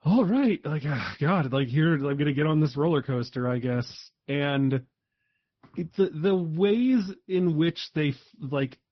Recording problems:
high frequencies cut off; noticeable; nothing above 5.5 kHz
garbled, watery; slightly

